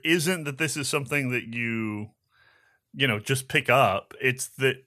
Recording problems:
none

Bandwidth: 14 kHz